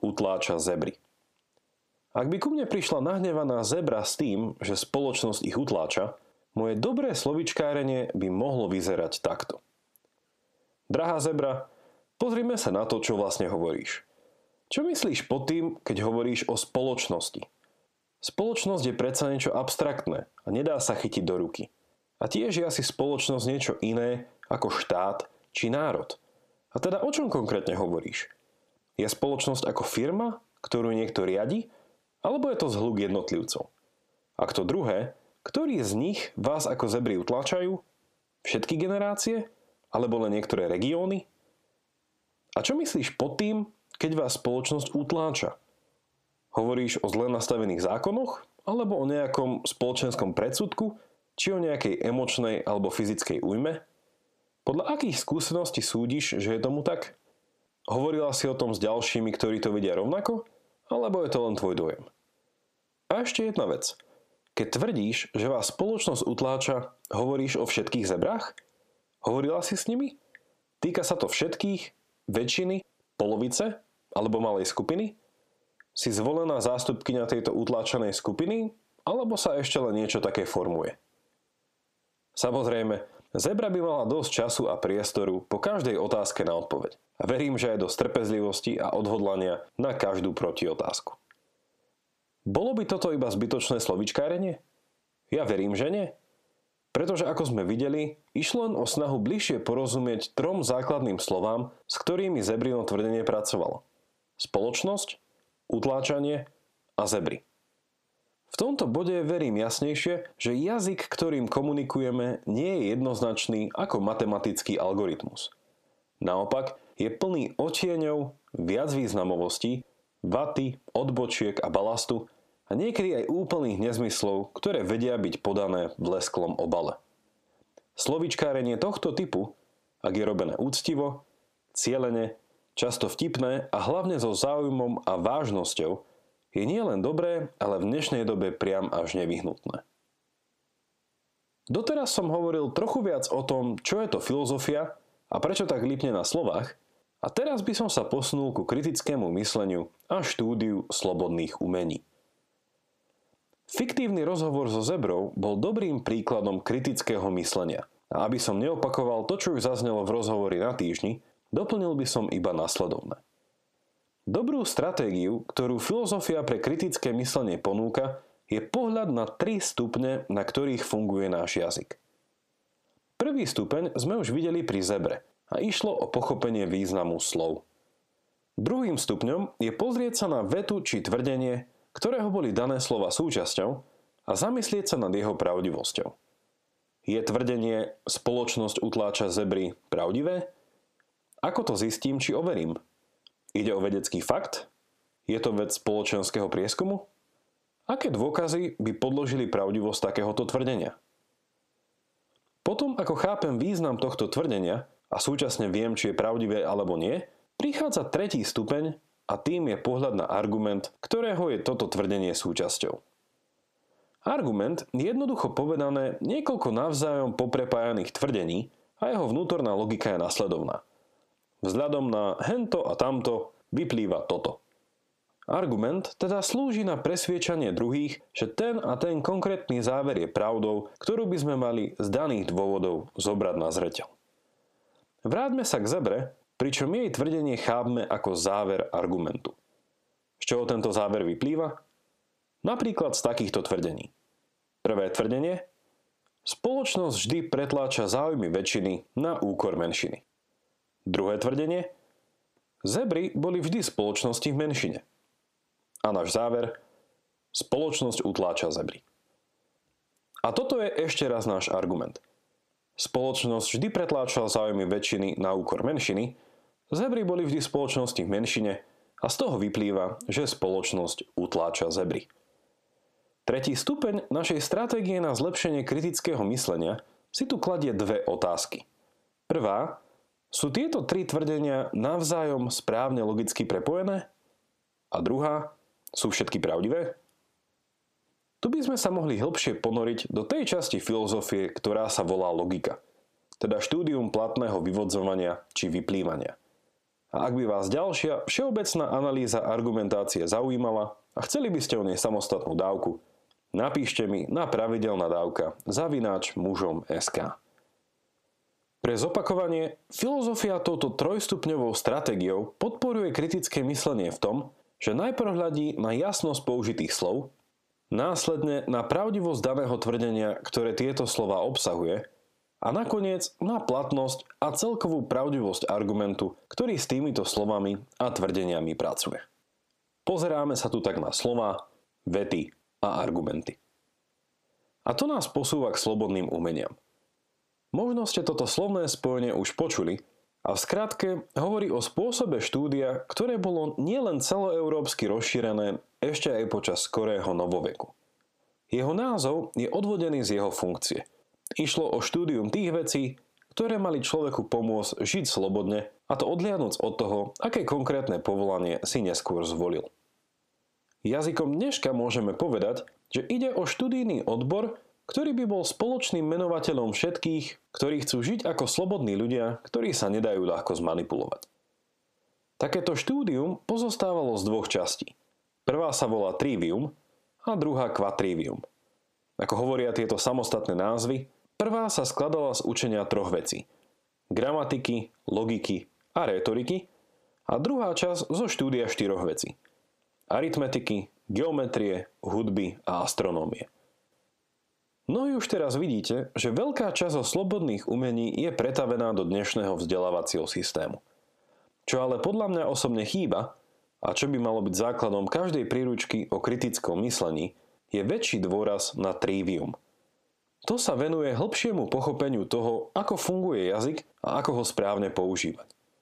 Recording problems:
squashed, flat; heavily

